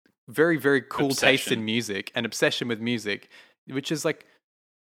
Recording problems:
none

